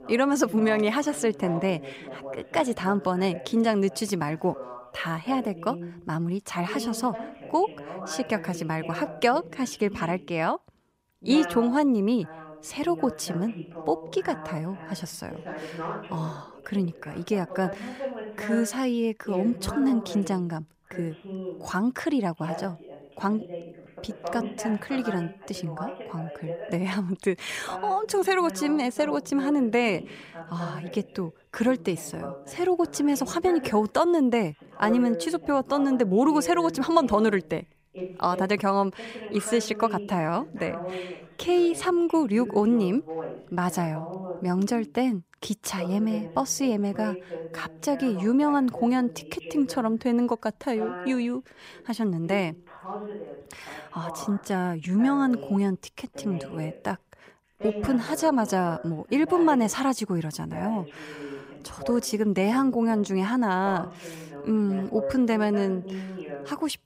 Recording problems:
voice in the background; noticeable; throughout; 10 dB below the speech

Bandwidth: 15.5 kHz